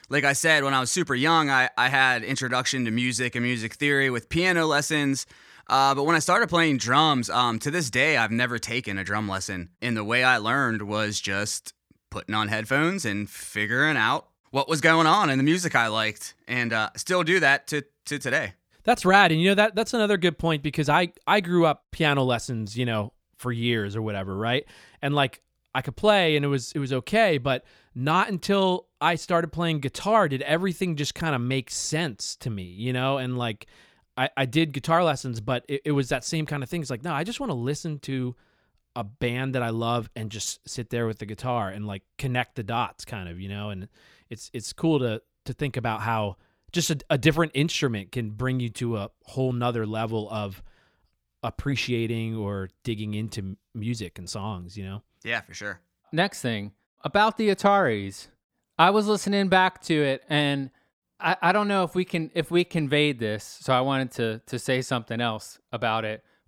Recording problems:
none

